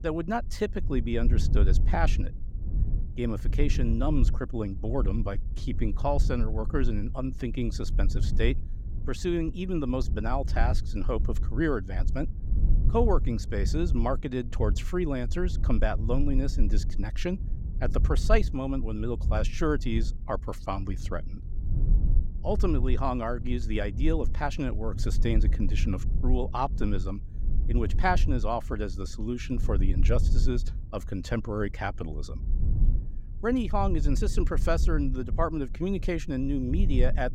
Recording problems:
low rumble; noticeable; throughout; 15 dB below the speech

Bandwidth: 16 kHz